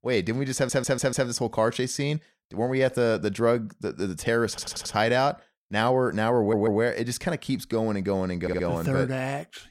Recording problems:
audio stuttering; 4 times, first at 0.5 s

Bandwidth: 16.5 kHz